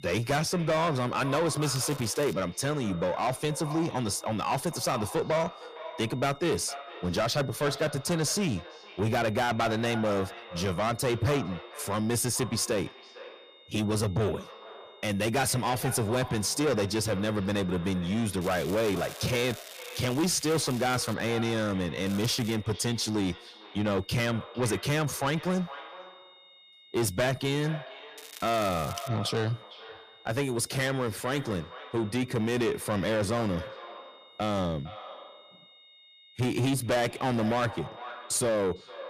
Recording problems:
distortion; heavy; 7 dB below the speech
echo of what is said; noticeable; throughout; 460 ms later, 15 dB below the speech
crackling; noticeable; 4 times, first at 1.5 s; 15 dB below the speech
high-pitched whine; faint; throughout; 3.5 kHz, 25 dB below the speech

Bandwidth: 15 kHz